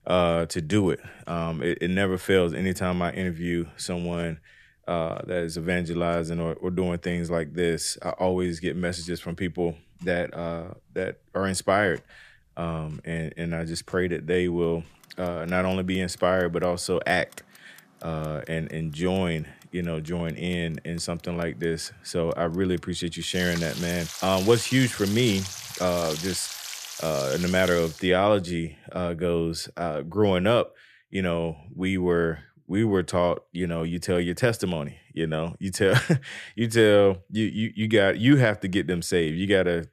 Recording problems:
household noises; loud; until 28 s; 9 dB below the speech

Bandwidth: 14.5 kHz